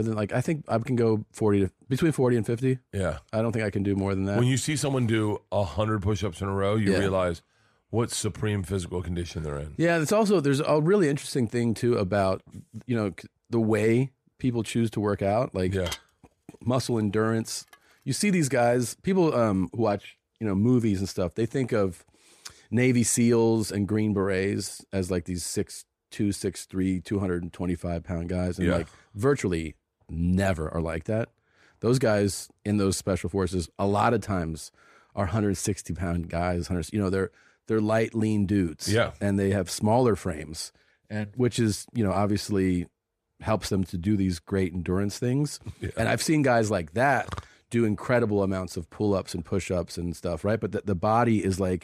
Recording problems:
abrupt cut into speech; at the start
clattering dishes; noticeable; from 16 to 18 s; peak 10 dB below the speech

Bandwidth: 14.5 kHz